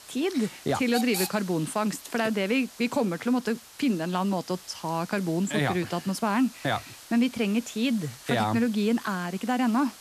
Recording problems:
hiss; noticeable; throughout; 15 dB below the speech

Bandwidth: 14 kHz